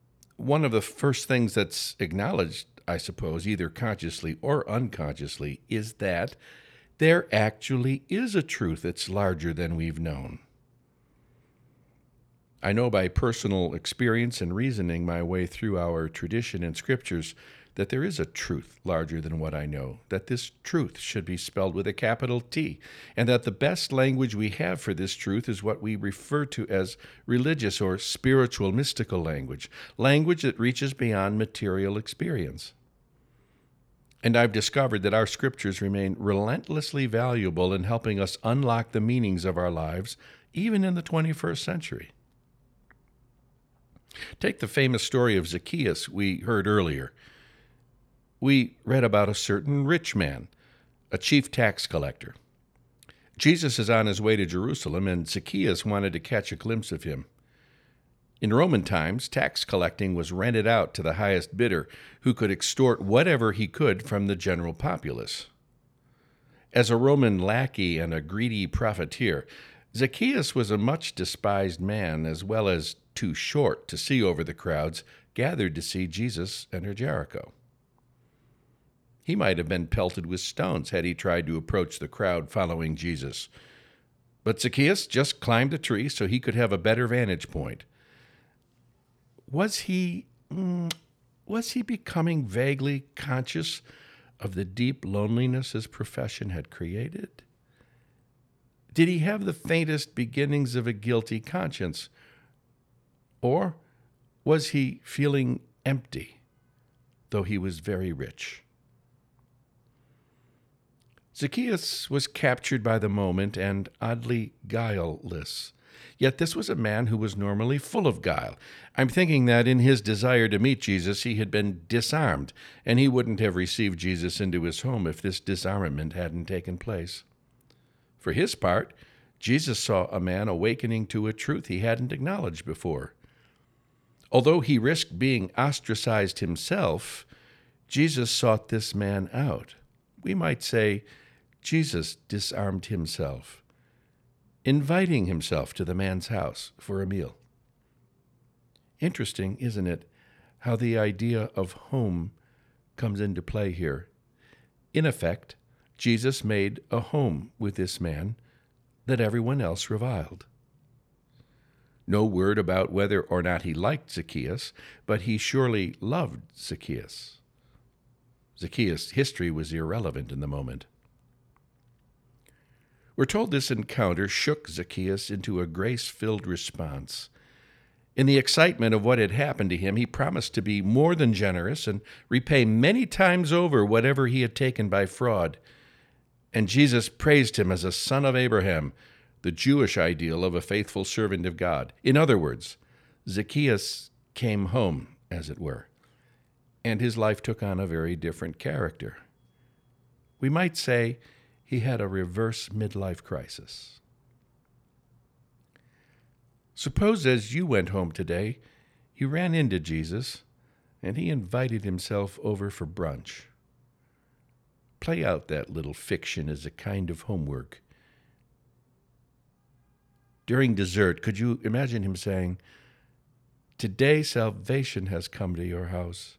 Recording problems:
none

